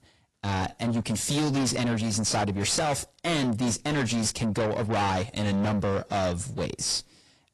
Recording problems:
distortion; heavy; 6 dB below the speech
garbled, watery; slightly

